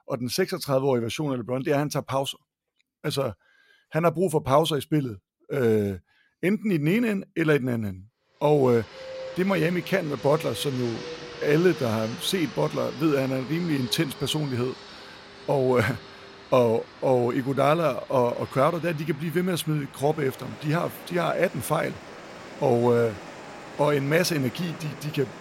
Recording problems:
train or aircraft noise; noticeable; from 8.5 s on; 15 dB below the speech

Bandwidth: 16 kHz